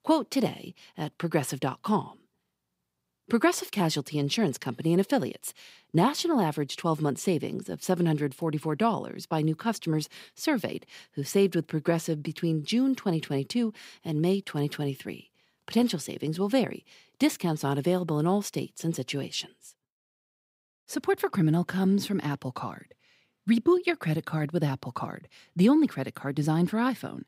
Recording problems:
none

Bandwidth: 15.5 kHz